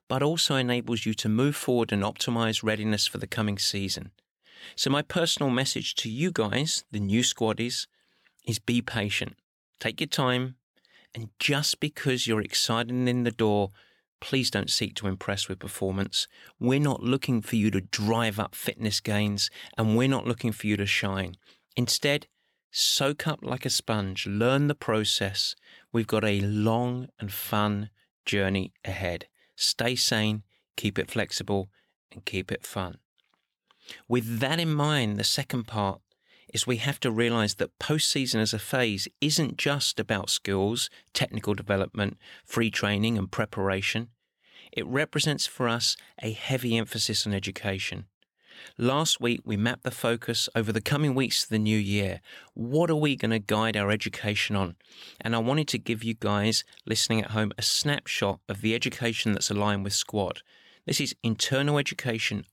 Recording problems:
none

